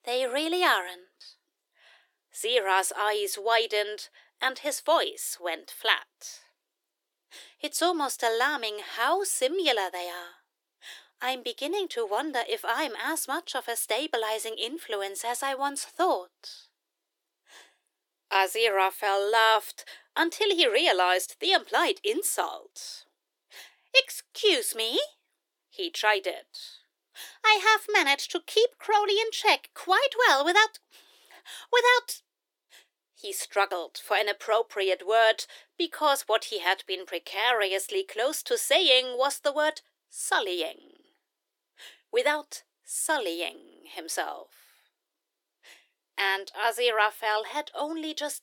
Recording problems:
thin; very; fading below 350 Hz

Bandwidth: 17.5 kHz